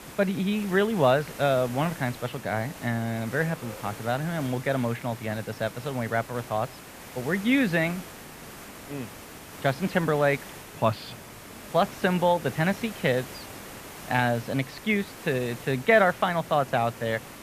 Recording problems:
muffled; very; fading above 3 kHz
hiss; noticeable; throughout; 15 dB below the speech
train or aircraft noise; faint; throughout; 25 dB below the speech

